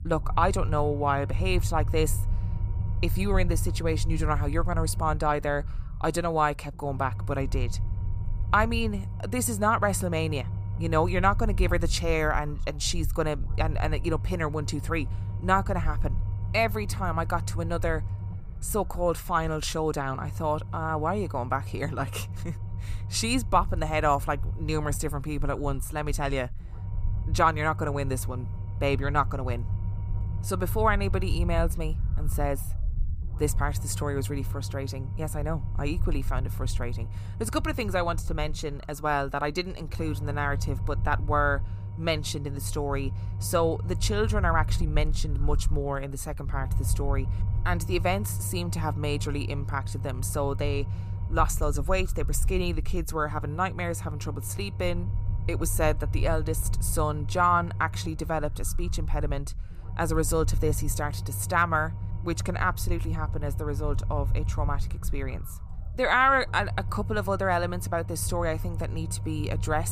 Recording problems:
low rumble; noticeable; throughout; 20 dB below the speech
abrupt cut into speech; at the end

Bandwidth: 15 kHz